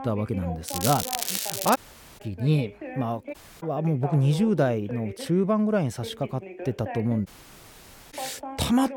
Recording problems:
crackling; loud; from 0.5 to 2 s; 2 dB below the speech
voice in the background; noticeable; throughout; 15 dB below the speech
audio cutting out; at 2 s, at 3.5 s and at 7.5 s for 1 s

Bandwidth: 18 kHz